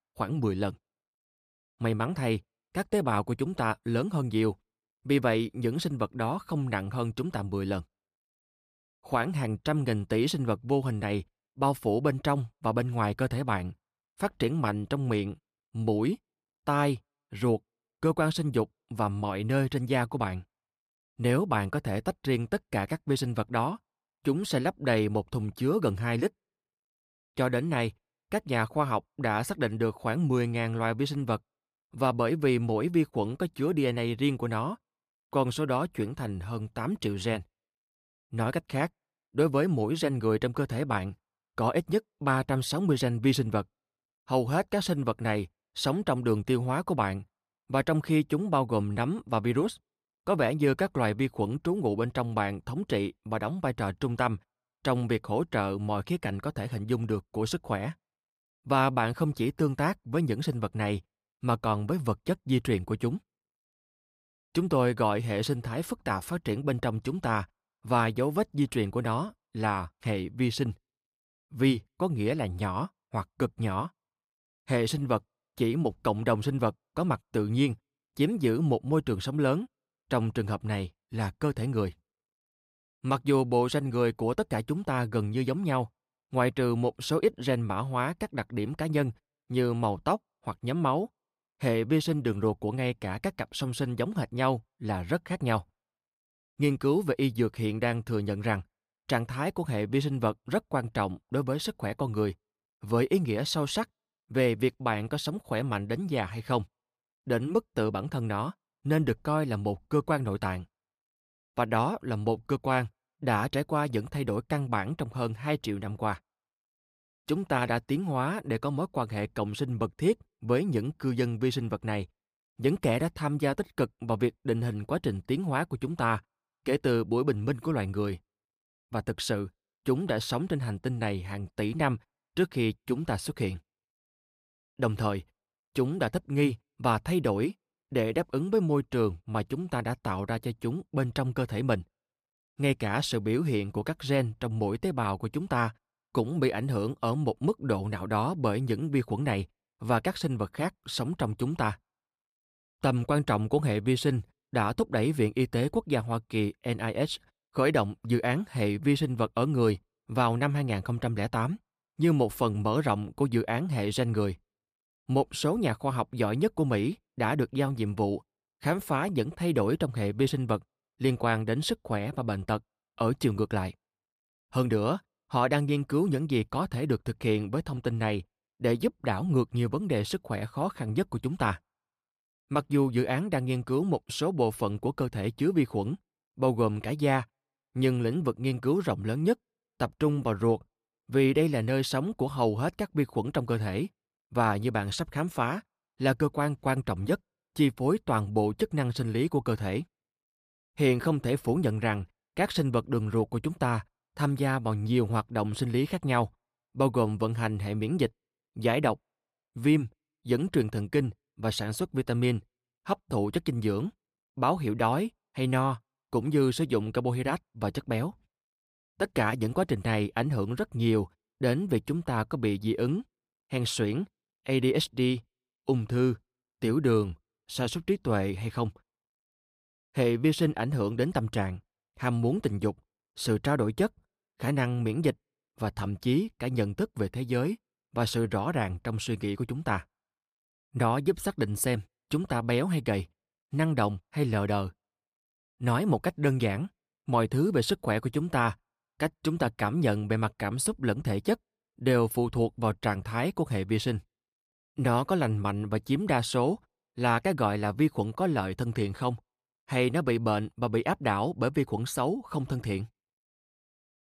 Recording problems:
none

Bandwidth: 15 kHz